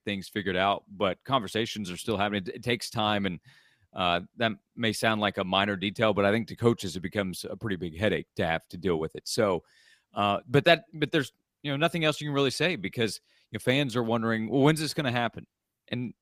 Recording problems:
none

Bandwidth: 15 kHz